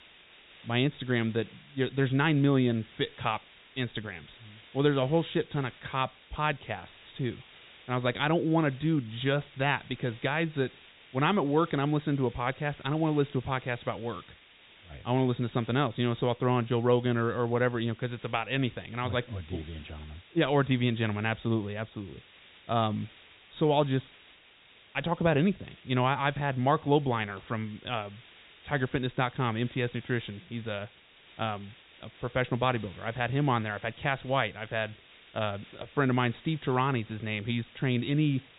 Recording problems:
high frequencies cut off; severe; nothing above 4 kHz
hiss; faint; throughout; 25 dB below the speech

